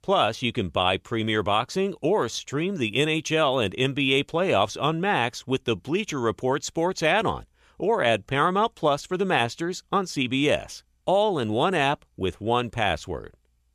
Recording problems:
none

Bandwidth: 14.5 kHz